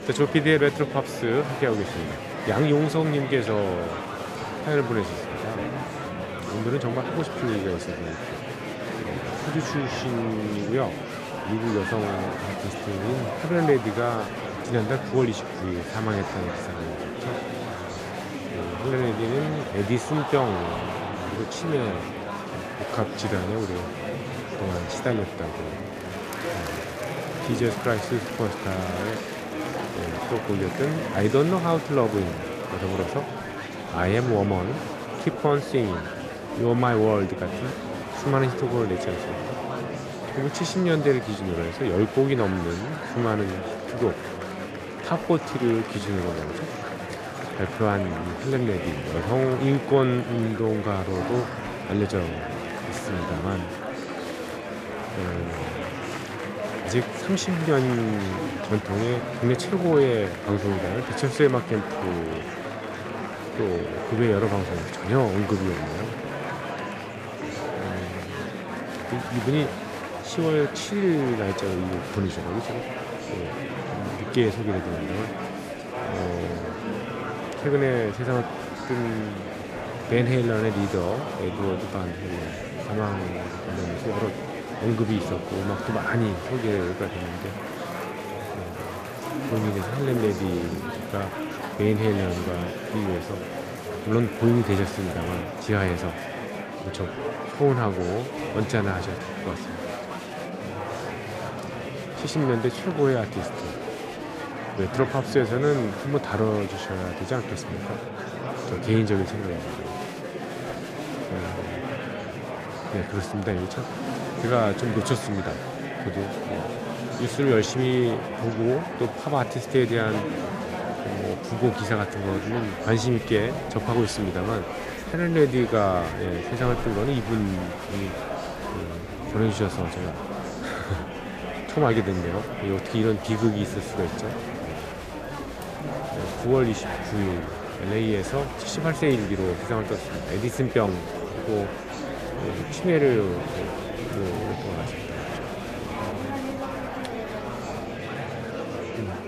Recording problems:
murmuring crowd; loud; throughout; 5 dB below the speech

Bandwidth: 14.5 kHz